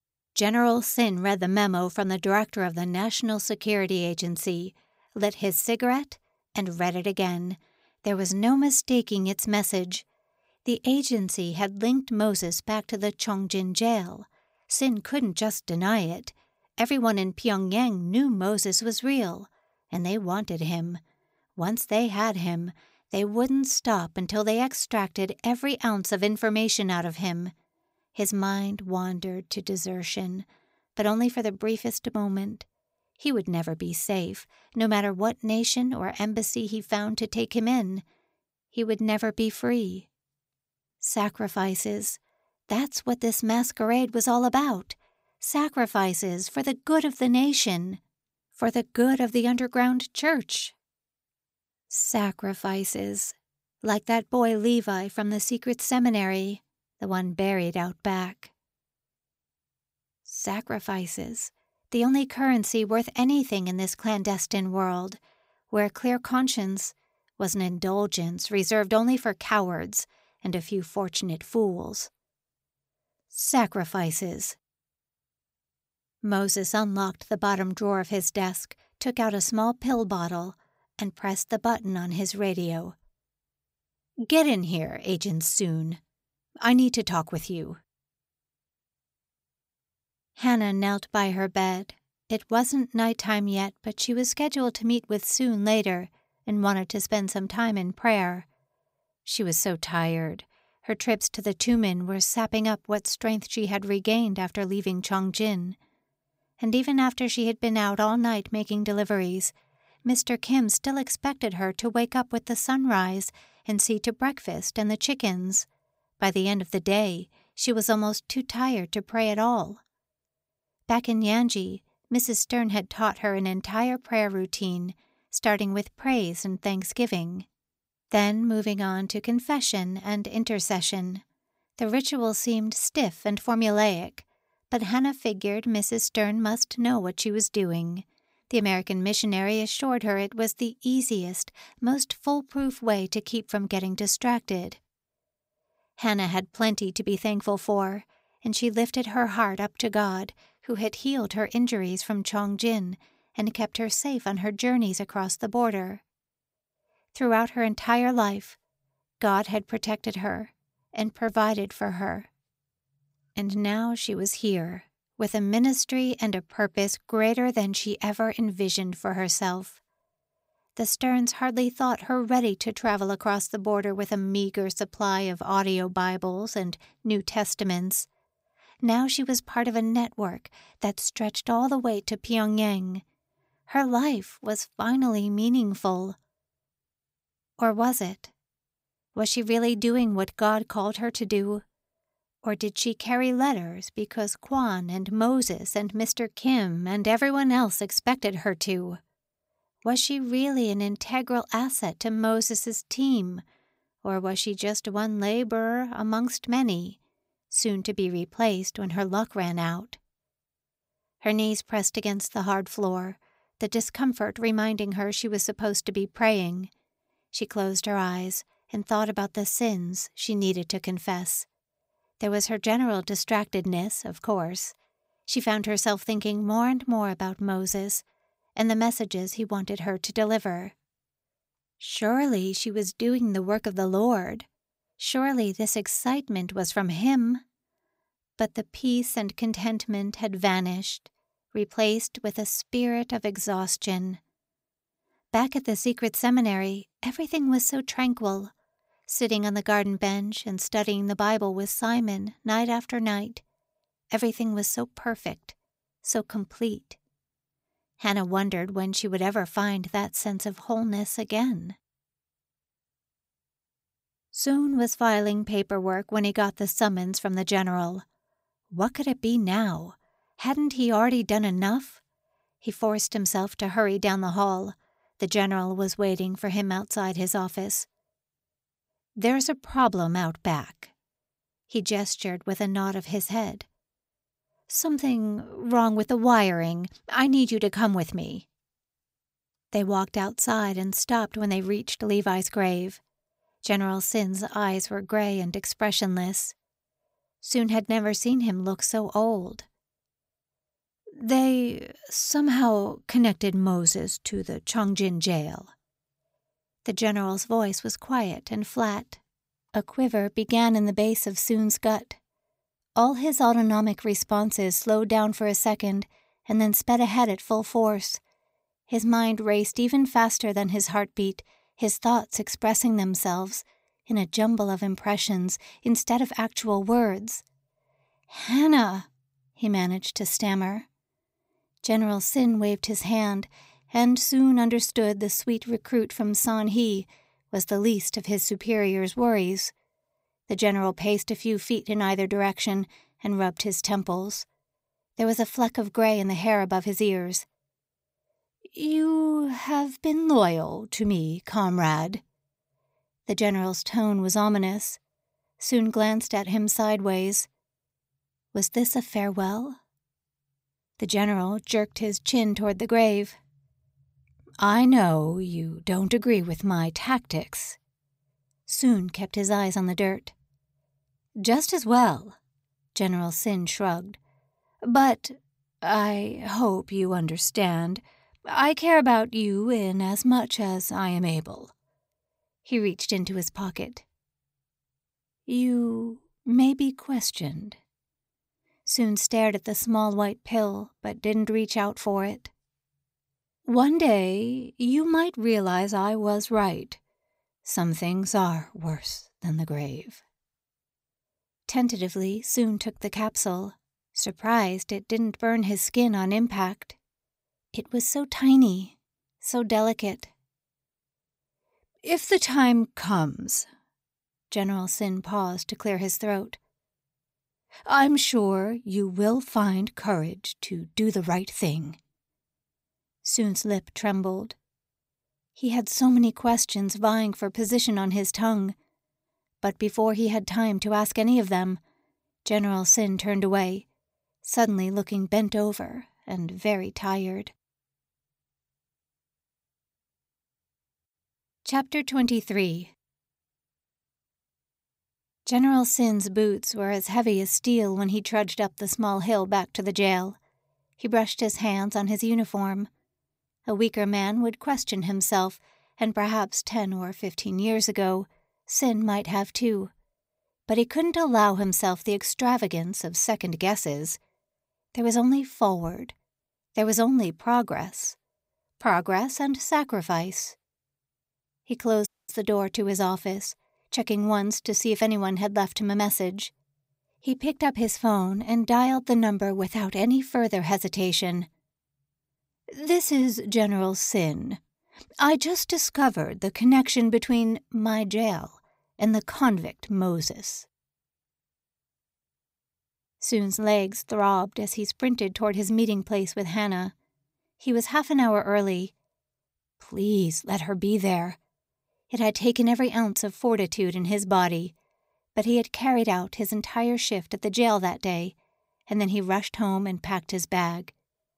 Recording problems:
audio cutting out; at 7:52

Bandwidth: 15.5 kHz